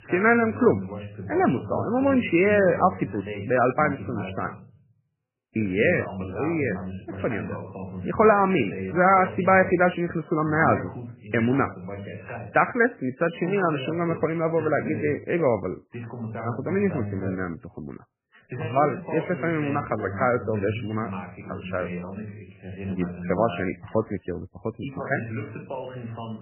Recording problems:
garbled, watery; badly; nothing above 2.5 kHz
voice in the background; noticeable; throughout; 10 dB below the speech

